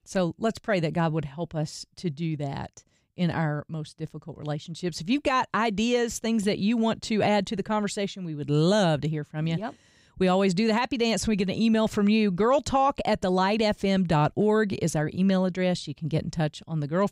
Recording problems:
none

